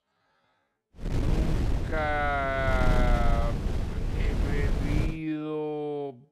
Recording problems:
wrong speed, natural pitch; too slow; 0.5 times normal speed
wind noise on the microphone; heavy; from 1 to 5 s; 8 dB below the speech

